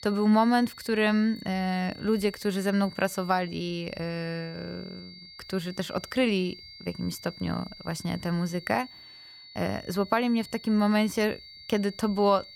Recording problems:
high-pitched whine; noticeable; throughout; 4.5 kHz, 15 dB below the speech

